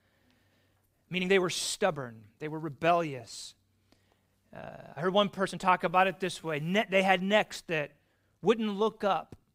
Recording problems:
uneven, jittery; strongly; from 1 to 9 s

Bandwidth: 15.5 kHz